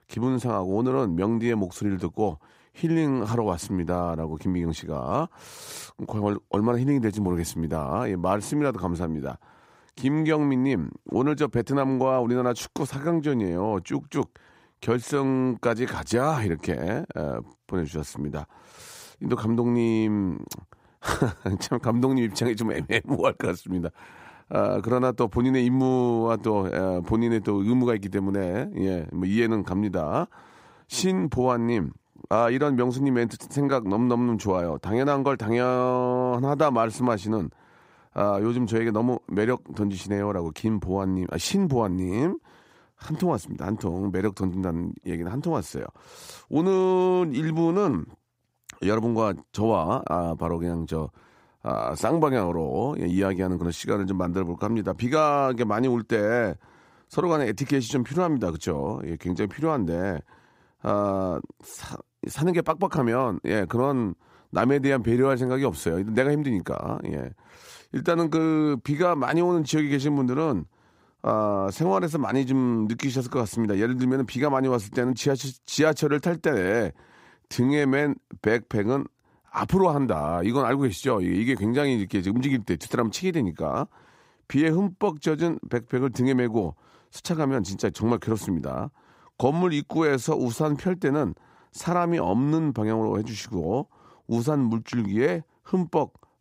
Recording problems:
none

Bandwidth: 15.5 kHz